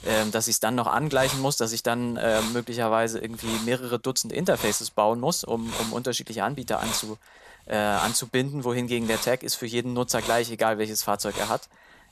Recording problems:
hiss; loud; throughout; 8 dB below the speech

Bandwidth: 13.5 kHz